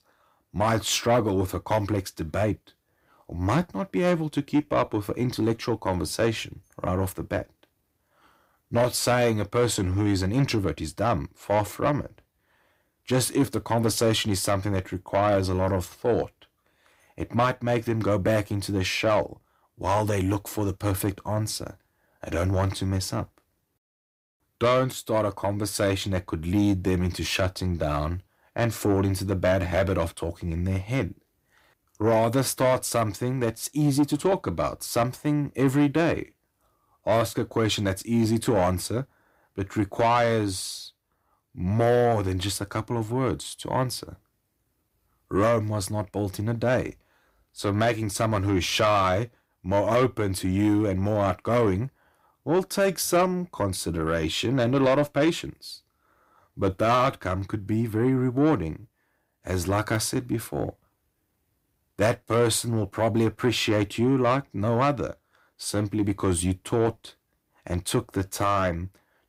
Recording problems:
distortion; slight; 10 dB below the speech

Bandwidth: 15.5 kHz